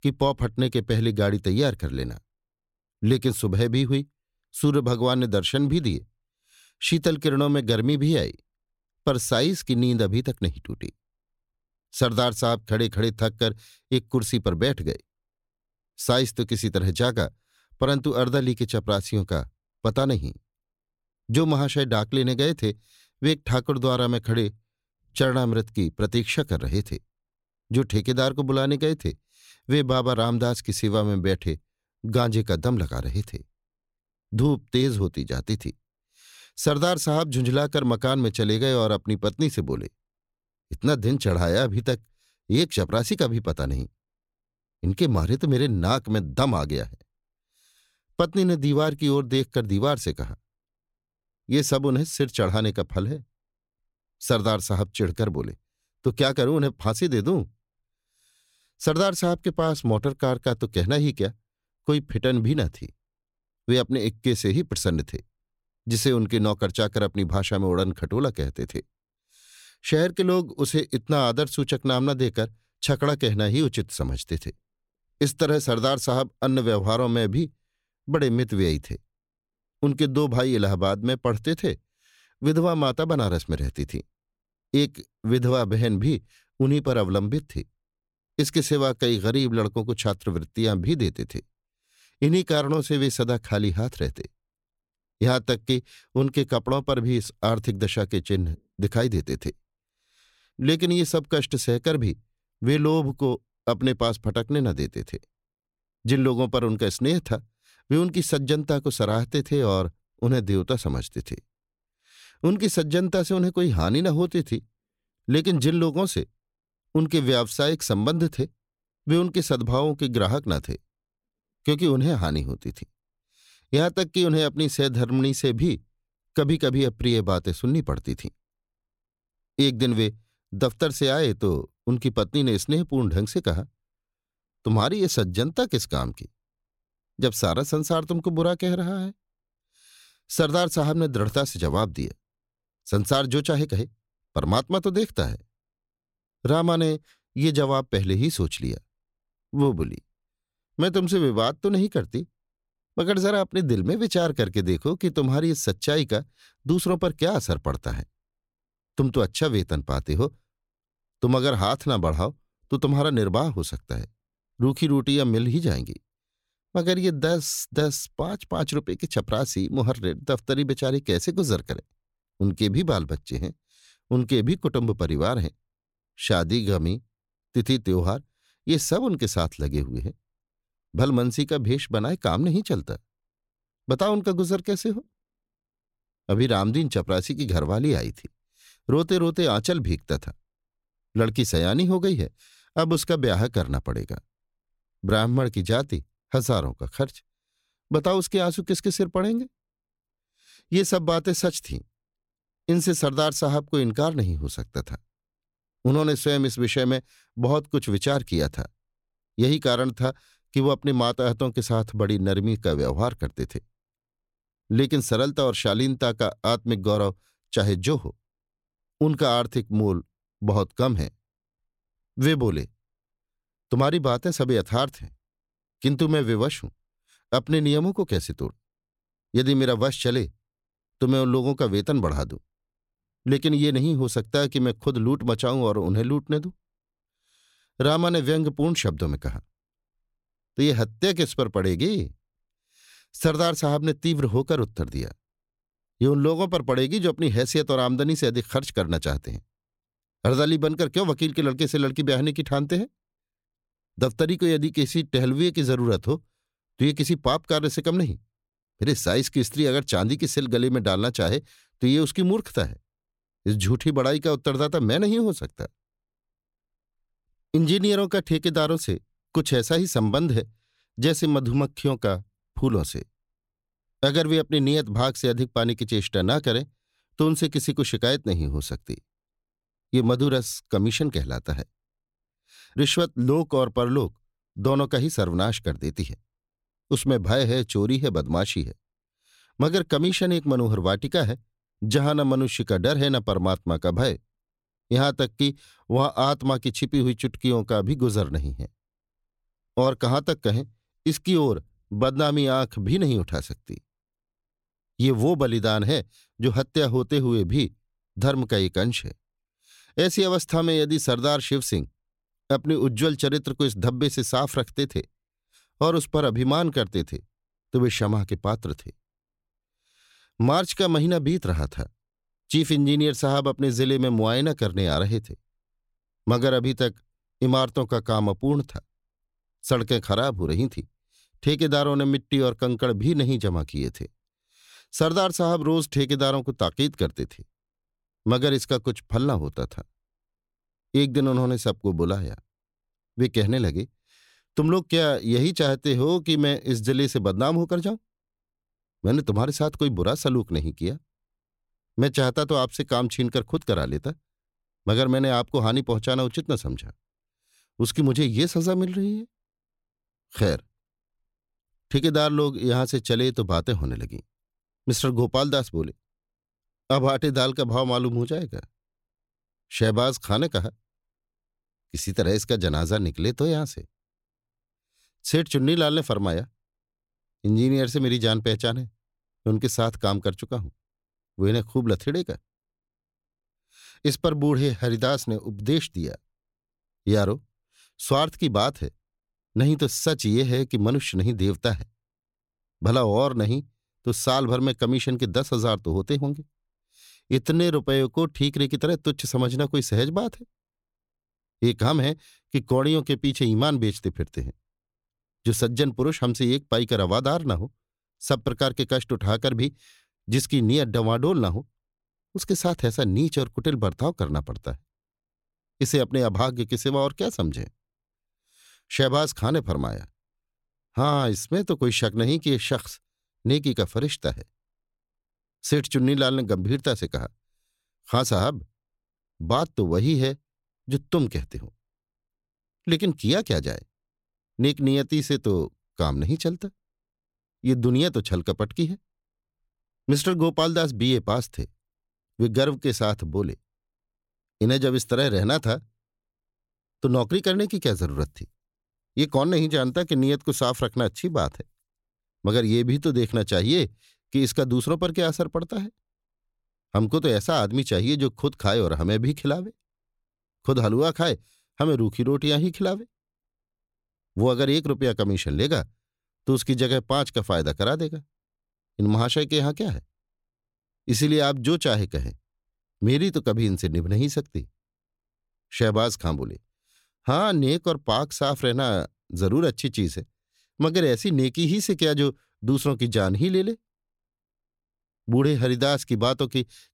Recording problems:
none

